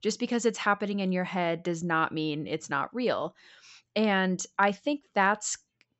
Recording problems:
high frequencies cut off; noticeable; nothing above 7.5 kHz

